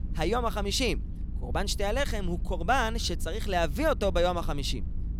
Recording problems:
low rumble; faint; throughout; 20 dB below the speech

